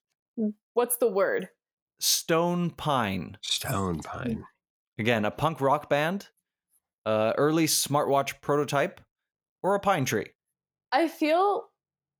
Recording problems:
none

